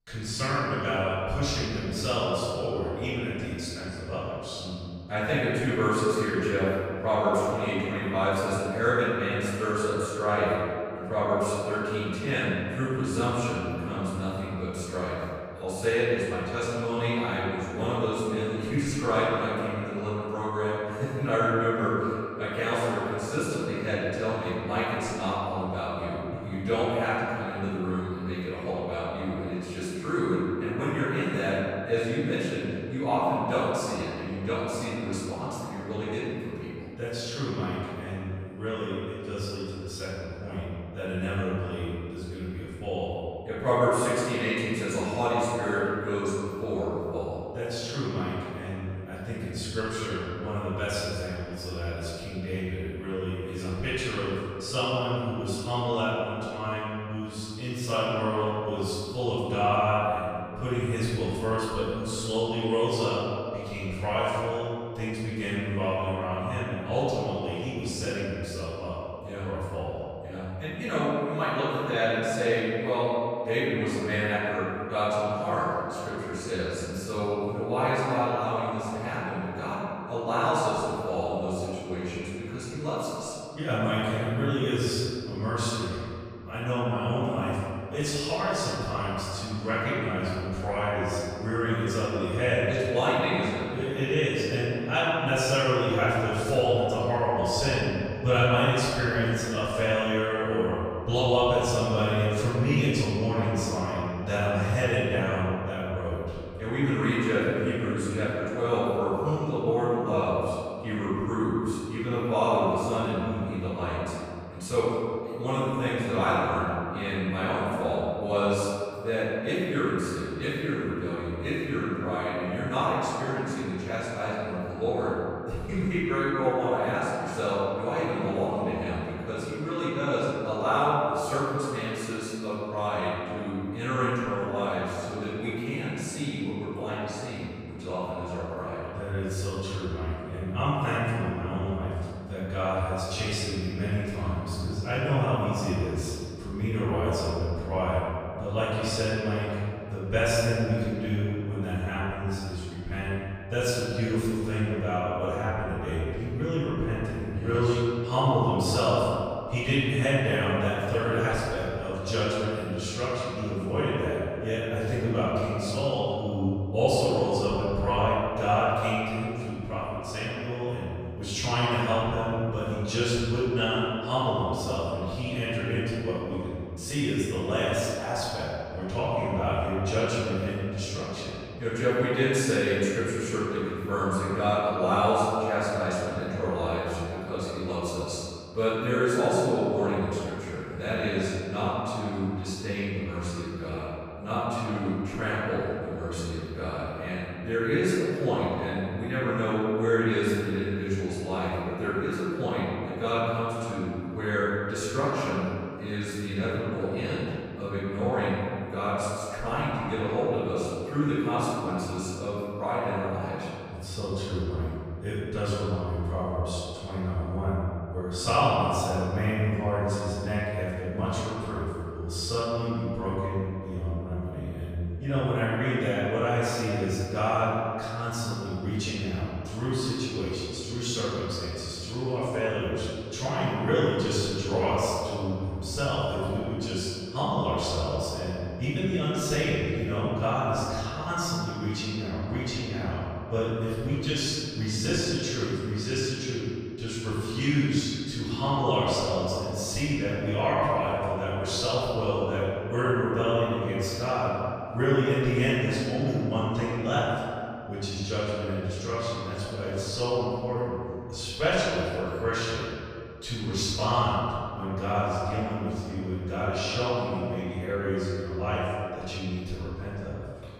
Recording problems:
room echo; strong; dies away in 2.3 s
off-mic speech; far

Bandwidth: 14.5 kHz